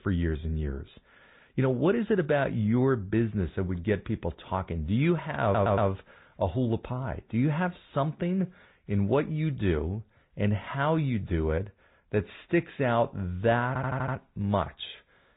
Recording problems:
high frequencies cut off; severe; nothing above 4 kHz
garbled, watery; slightly
audio stuttering; at 5.5 s and at 14 s

